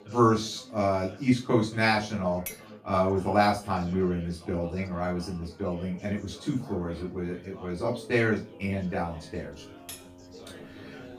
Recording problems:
off-mic speech; far
room echo; slight; dies away in 0.3 s
background music; faint; throughout; 25 dB below the speech
chatter from many people; faint; throughout; 20 dB below the speech
clattering dishes; faint; at 2.5 s and at 10 s; peak 10 dB below the speech

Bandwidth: 15 kHz